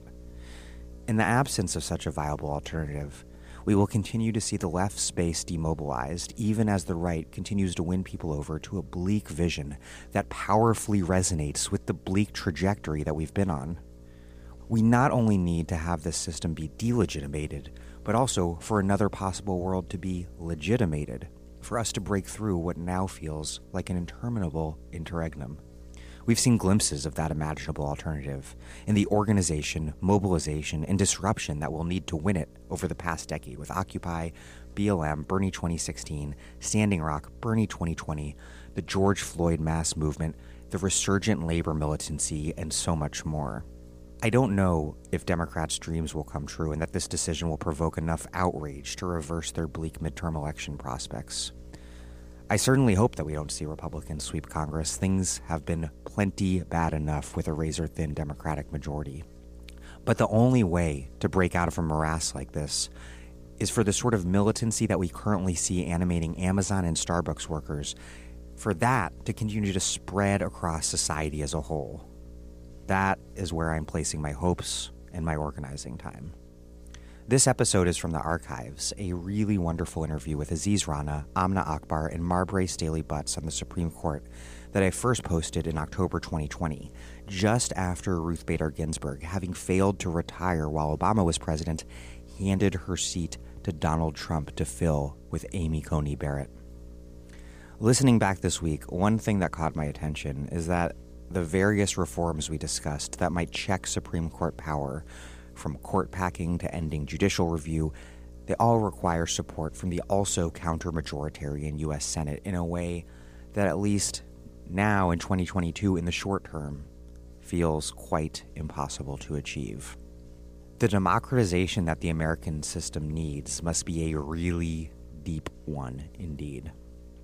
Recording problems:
electrical hum; faint; throughout; 60 Hz, 25 dB below the speech

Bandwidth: 15 kHz